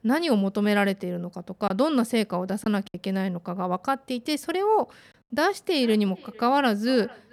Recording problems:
echo of what is said; faint; from 5.5 s on; 450 ms later, 25 dB below the speech
choppy; occasionally; from 1.5 to 3 s; 3% of the speech affected

